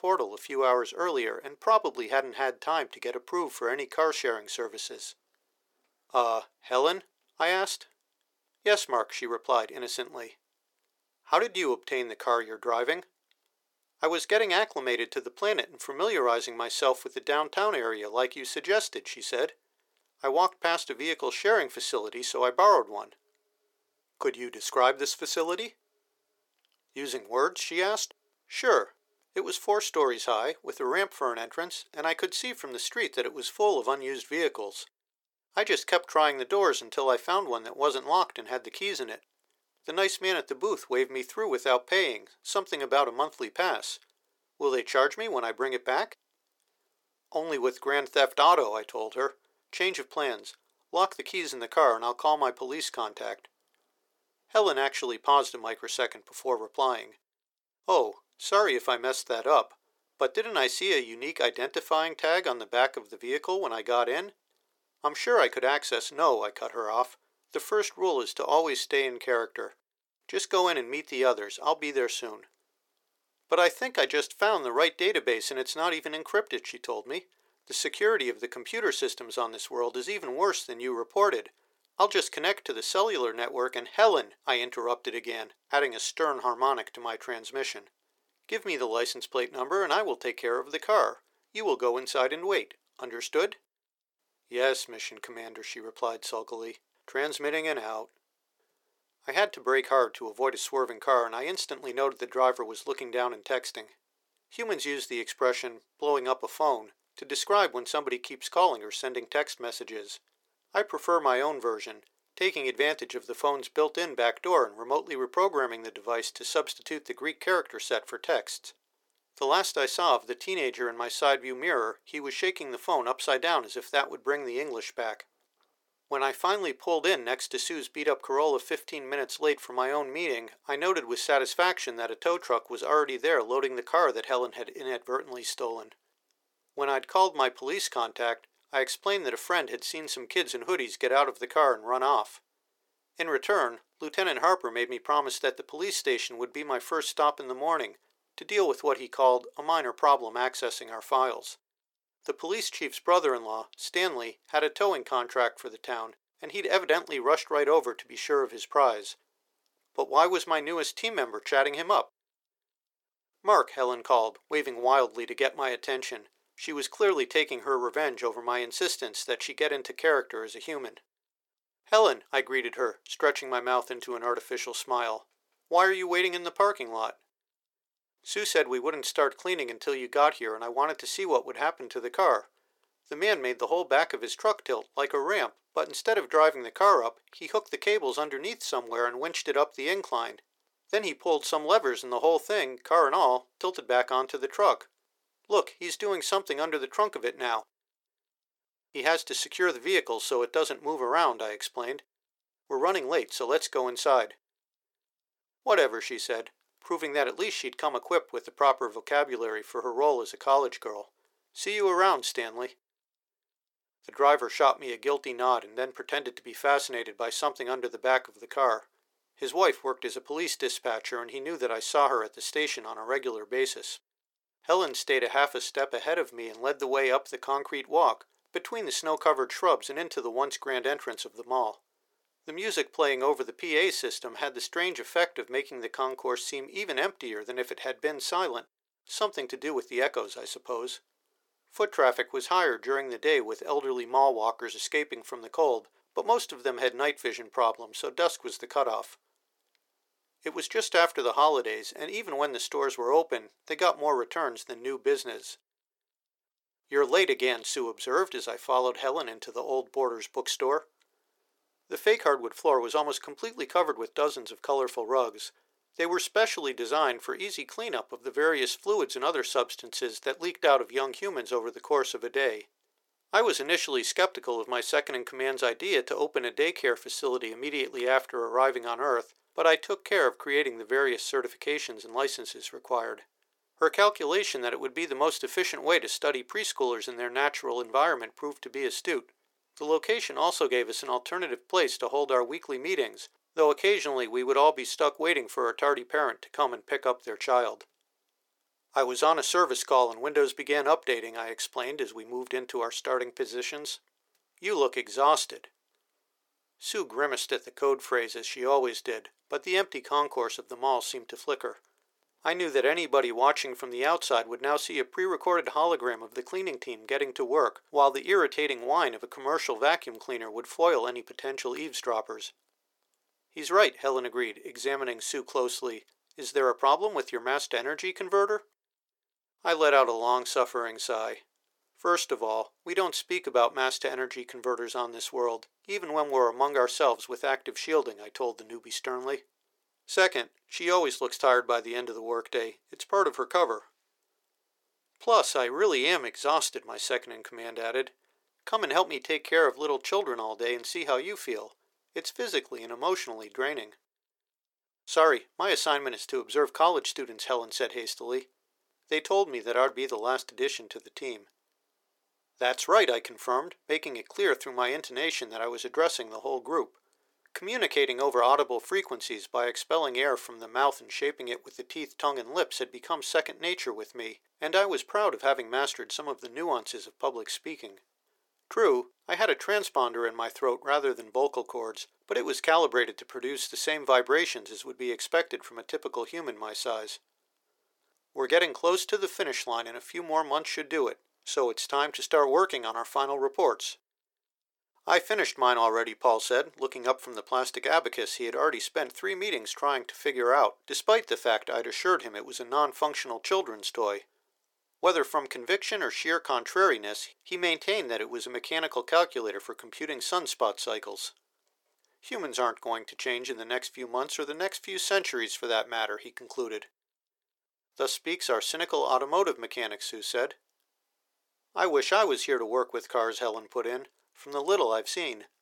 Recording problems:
thin; very; fading below 400 Hz

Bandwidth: 17 kHz